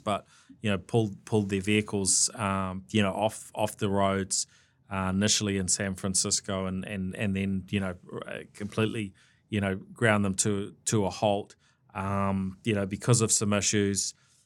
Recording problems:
none

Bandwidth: 18.5 kHz